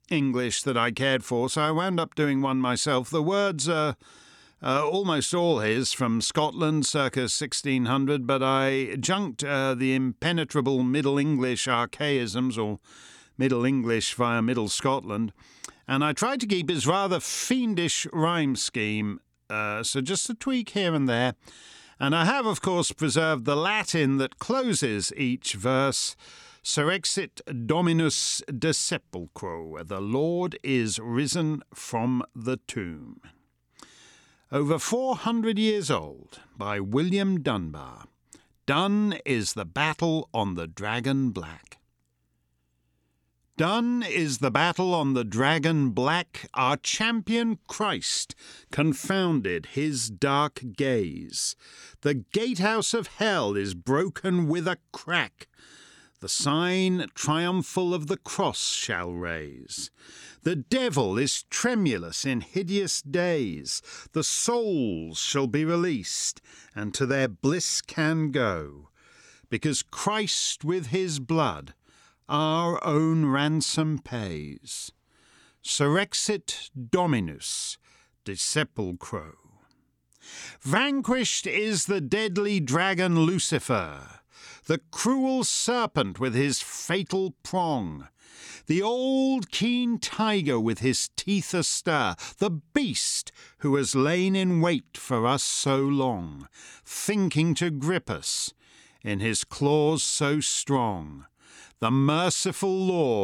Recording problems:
abrupt cut into speech; at the end

